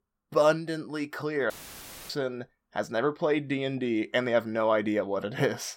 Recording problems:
audio cutting out; filled with static; at 1.5 s for 0.5 s

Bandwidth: 16.5 kHz